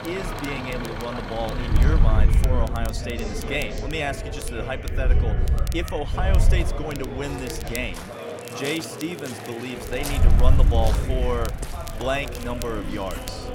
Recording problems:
traffic noise; loud; throughout; 9 dB below the speech
chatter from many people; loud; throughout; 6 dB below the speech
rain or running water; noticeable; throughout; 10 dB below the speech
wind noise on the microphone; occasional gusts; from 1.5 to 8 s and from 10 s on; 10 dB below the speech
crackle, like an old record; noticeable; 15 dB below the speech

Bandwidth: 16 kHz